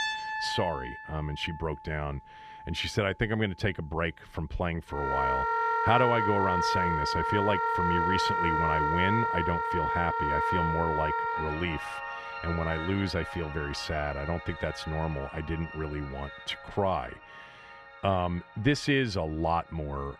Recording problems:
background music; very loud; throughout; 1 dB above the speech

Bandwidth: 14 kHz